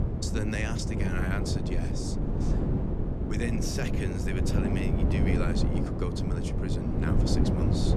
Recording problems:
wind noise on the microphone; heavy; 1 dB above the speech

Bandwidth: 13.5 kHz